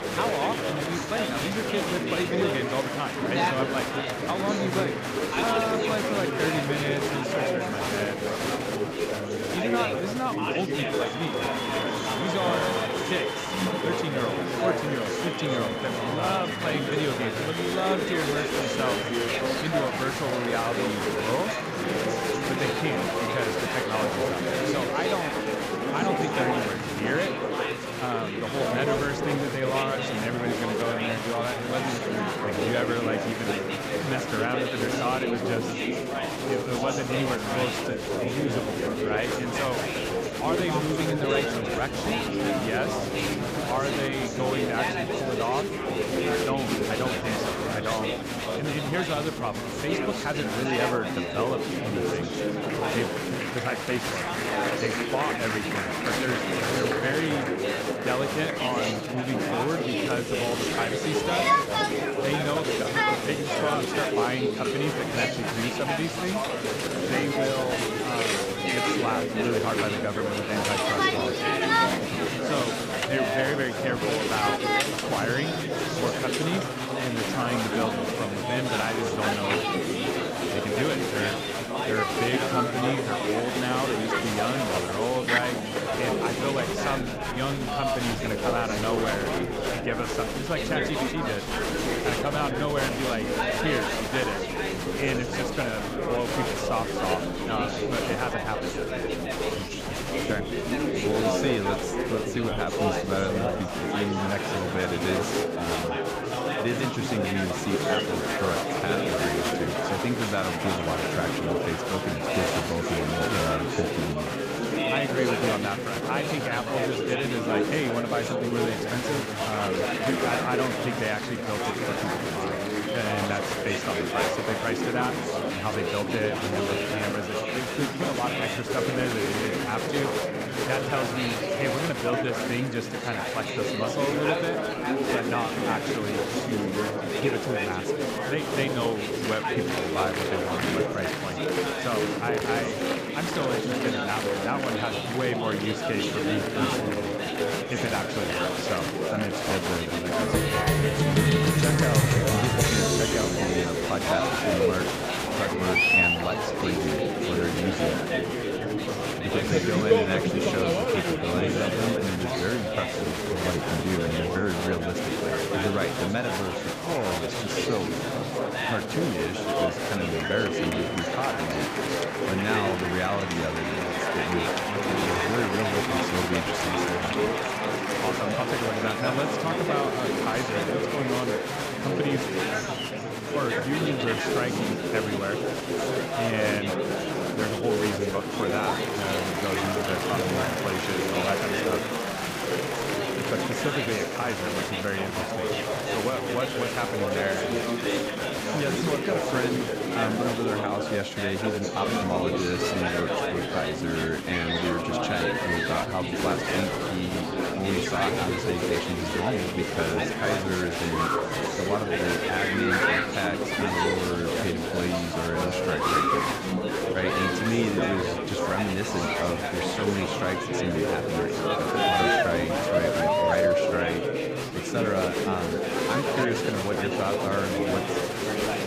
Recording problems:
murmuring crowd; very loud; throughout; 4 dB above the speech

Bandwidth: 15 kHz